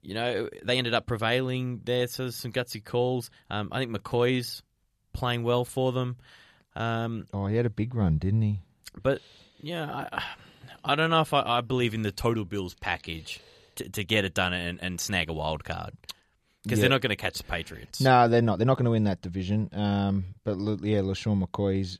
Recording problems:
uneven, jittery; strongly; from 0.5 to 21 s

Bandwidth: 14 kHz